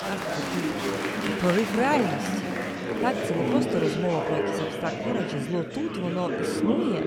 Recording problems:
chatter from many people; very loud; throughout; 1 dB above the speech

